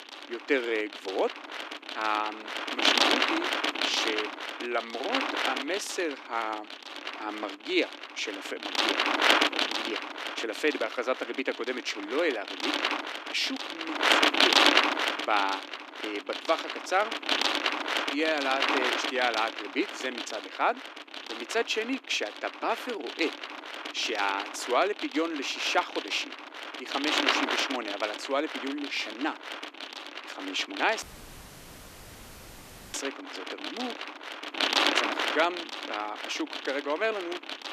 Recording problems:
thin; somewhat; fading below 300 Hz
wind noise on the microphone; heavy; 2 dB above the speech
audio cutting out; at 31 s for 2 s

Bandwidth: 14.5 kHz